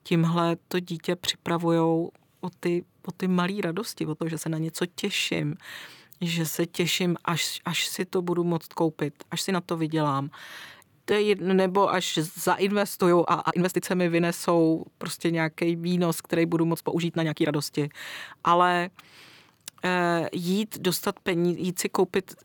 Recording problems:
uneven, jittery; strongly; from 2.5 to 22 s

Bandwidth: 19 kHz